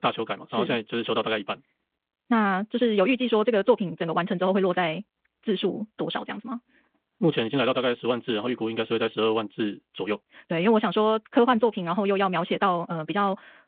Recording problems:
wrong speed, natural pitch; too fast; 1.6 times normal speed
phone-call audio

